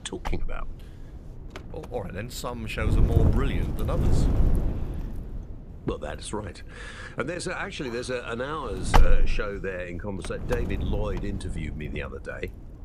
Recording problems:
wind noise on the microphone; heavy; 2 dB below the speech

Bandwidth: 14.5 kHz